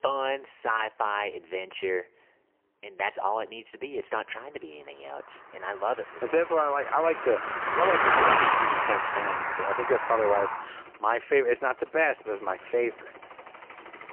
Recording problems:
phone-call audio; poor line; nothing above 3 kHz
traffic noise; very loud; throughout; 3 dB above the speech

